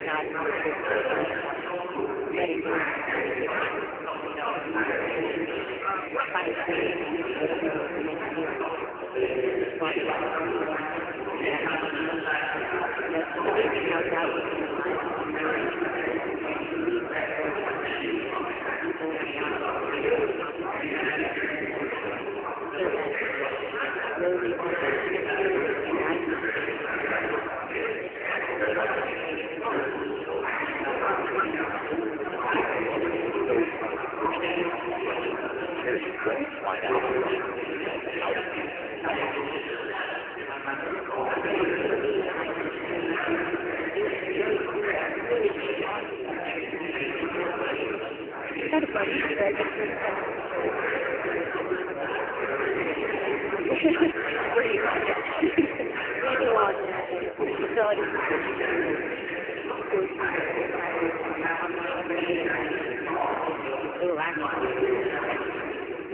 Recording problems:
phone-call audio; poor line; nothing above 3 kHz
chatter from many people; very loud; throughout; 3 dB above the speech

